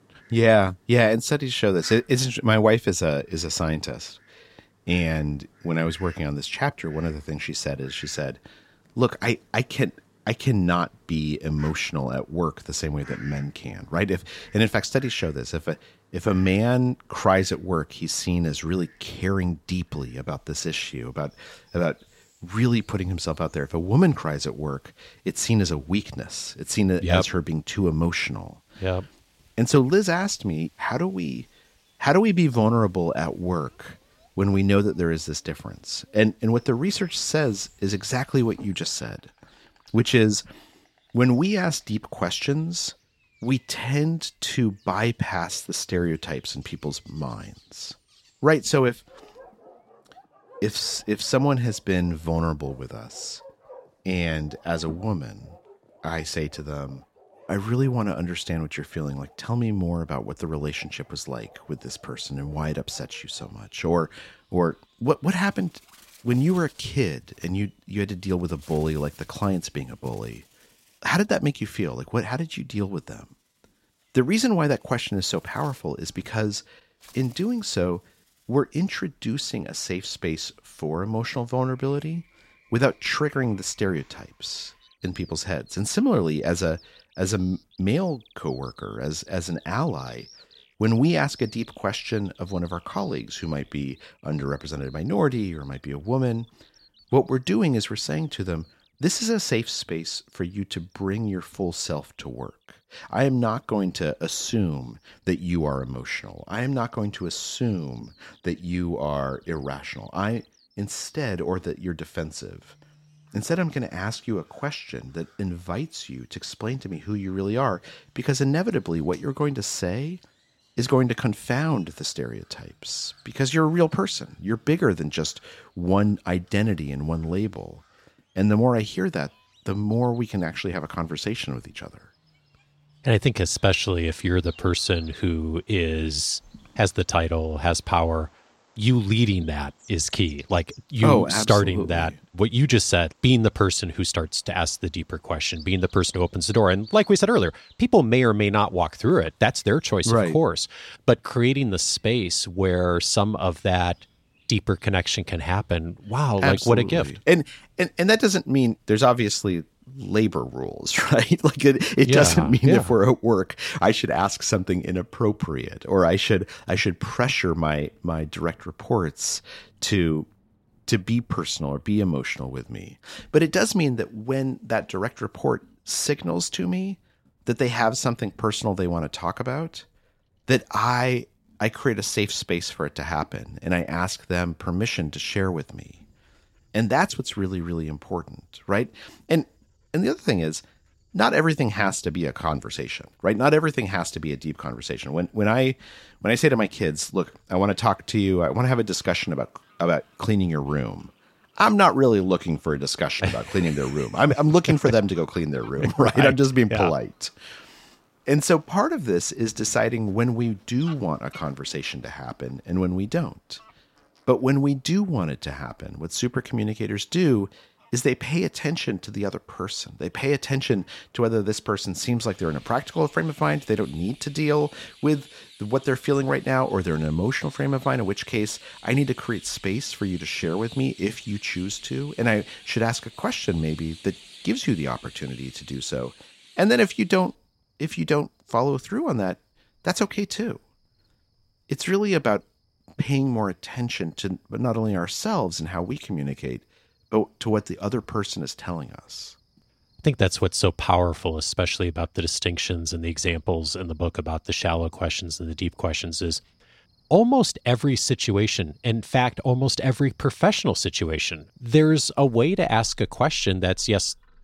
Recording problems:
animal sounds; faint; throughout; 25 dB below the speech

